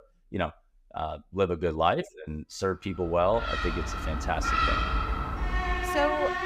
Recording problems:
animal sounds; very loud; from 3.5 s on; 1 dB above the speech

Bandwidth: 15.5 kHz